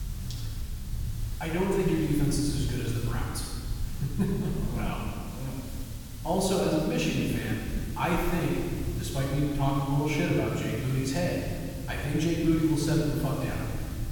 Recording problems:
room echo; strong; dies away in 1.9 s
off-mic speech; far
hiss; noticeable; throughout; 15 dB below the speech
low rumble; faint; throughout; 25 dB below the speech

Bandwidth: 18 kHz